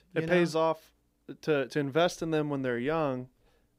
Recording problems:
none

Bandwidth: 15.5 kHz